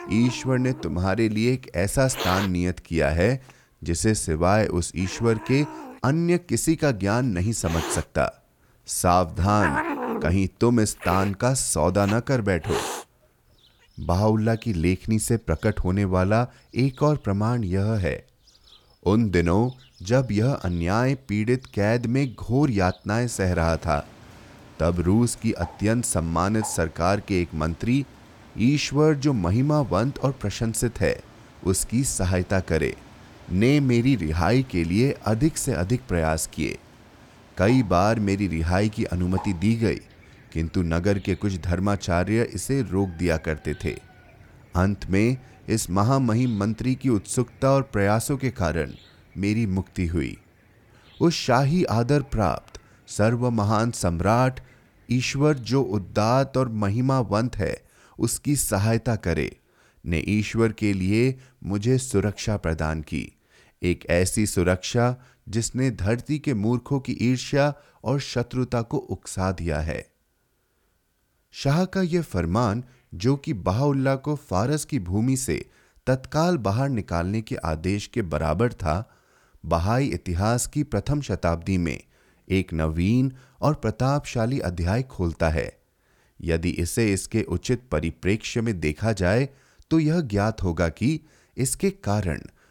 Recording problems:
animal sounds; noticeable; throughout; 15 dB below the speech

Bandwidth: 18.5 kHz